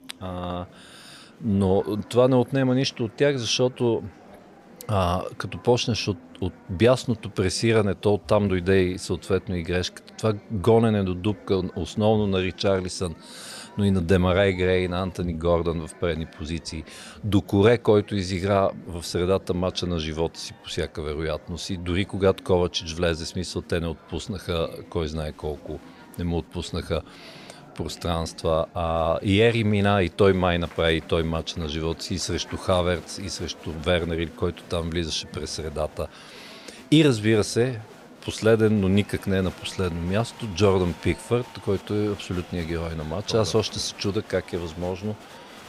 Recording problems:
murmuring crowd; faint; throughout; 20 dB below the speech

